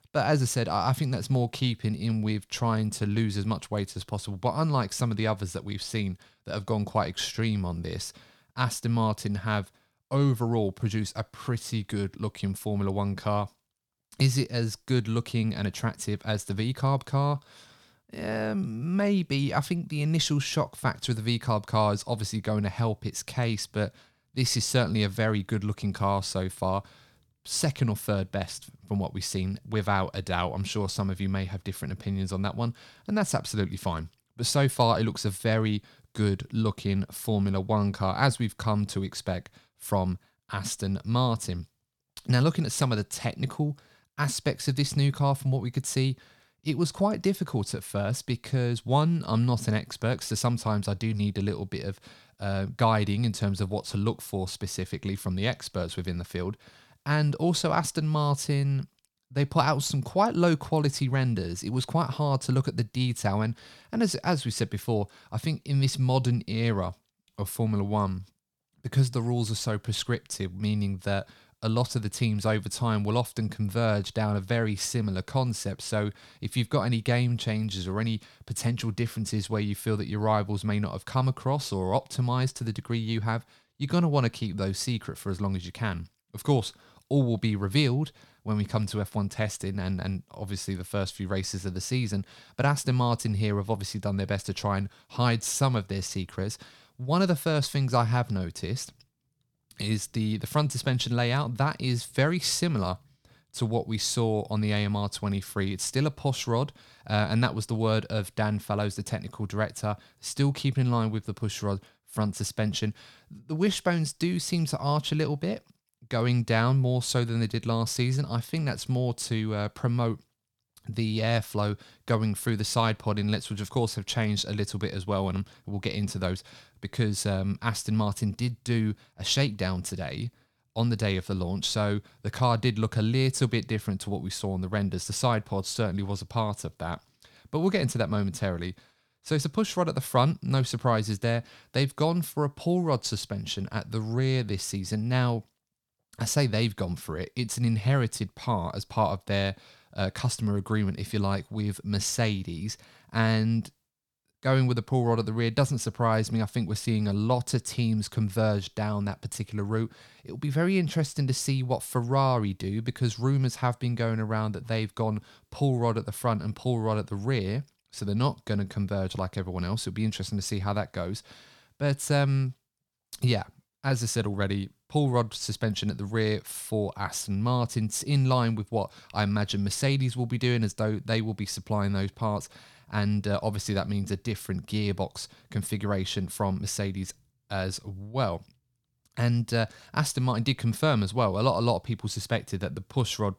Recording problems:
none

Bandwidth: 18.5 kHz